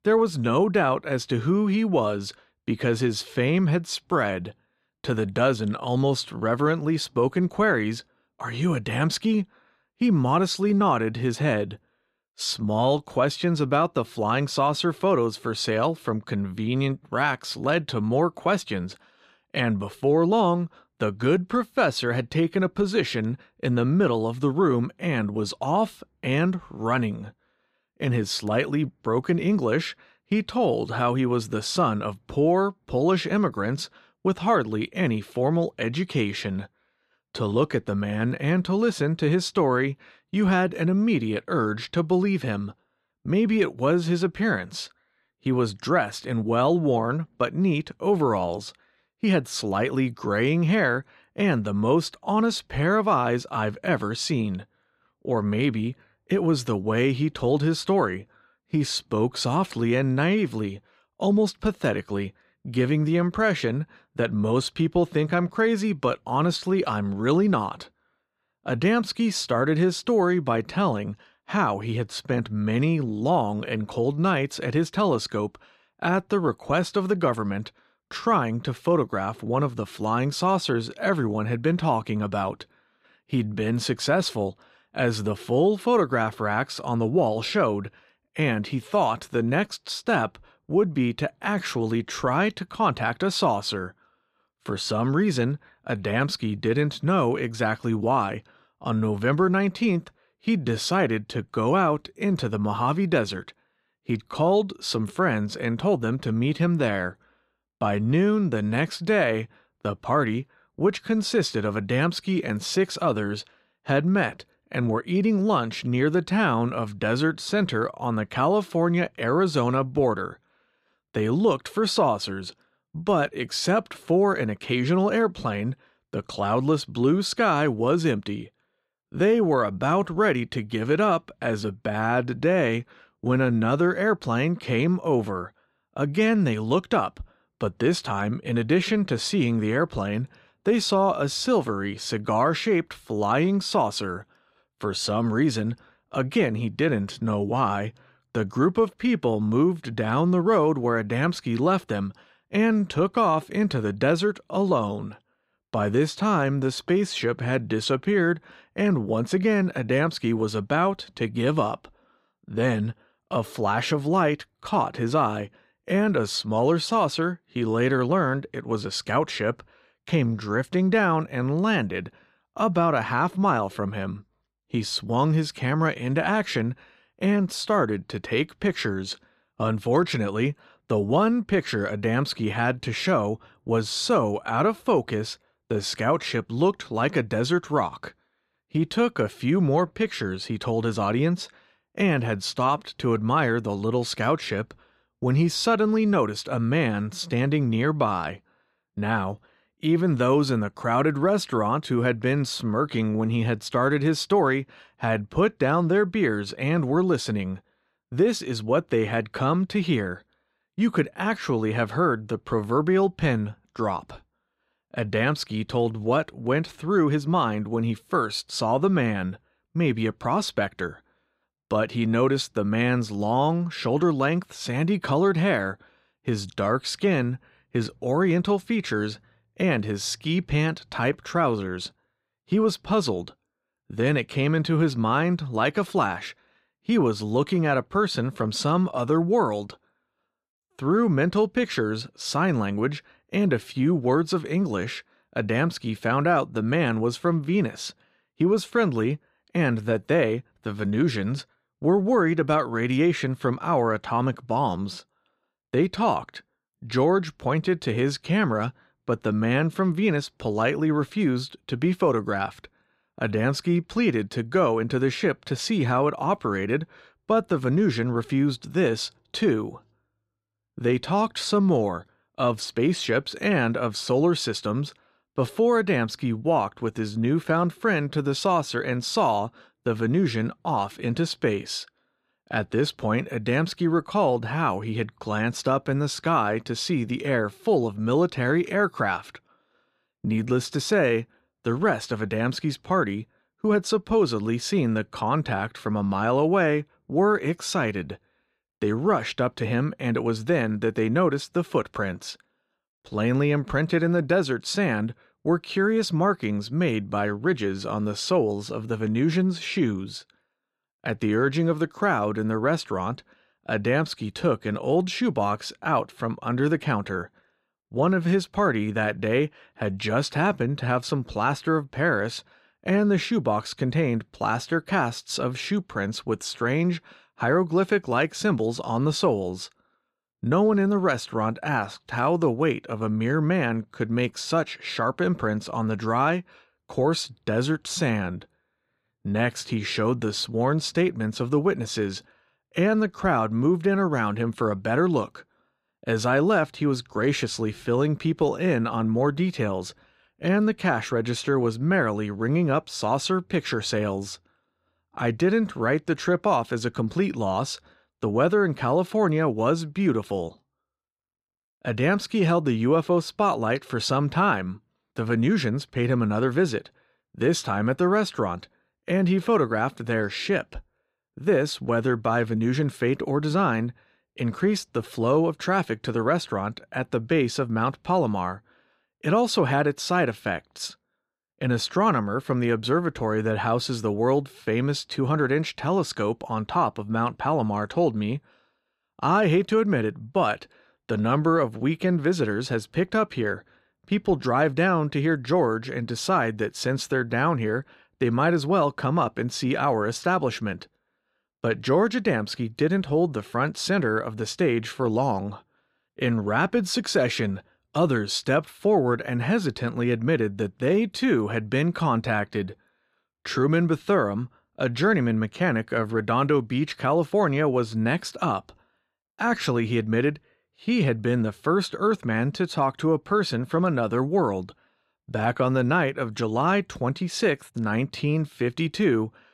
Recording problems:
none

